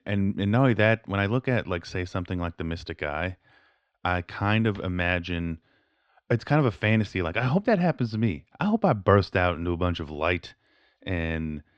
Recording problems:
muffled; very slightly; fading above 4 kHz

